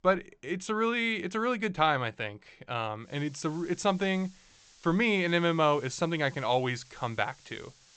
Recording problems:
high frequencies cut off; noticeable; nothing above 8 kHz
hiss; faint; from 3 s on; 25 dB below the speech

